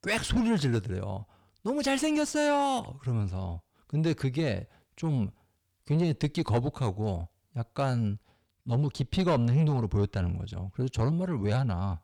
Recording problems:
distortion; slight; 10 dB below the speech

